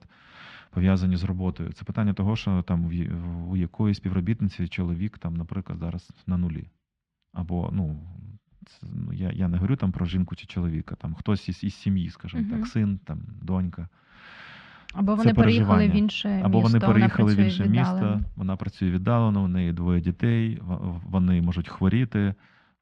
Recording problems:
muffled; slightly; fading above 3 kHz

